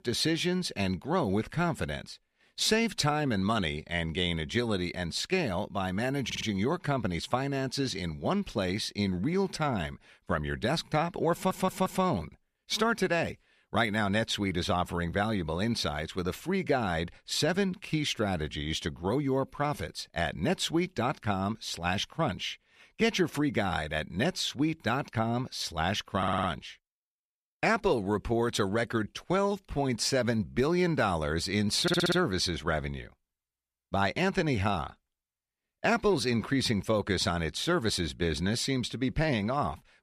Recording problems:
audio stuttering; 4 times, first at 6.5 s

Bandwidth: 14.5 kHz